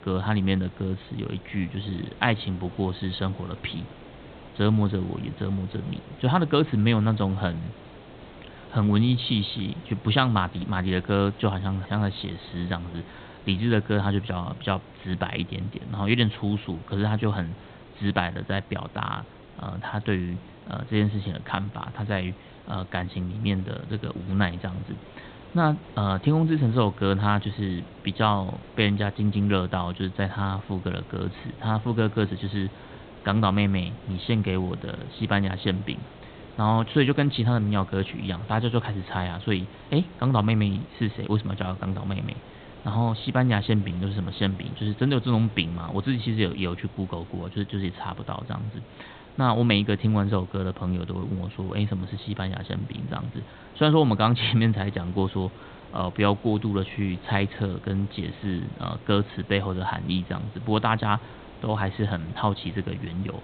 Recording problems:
high frequencies cut off; severe; nothing above 4 kHz
hiss; noticeable; throughout; 20 dB below the speech

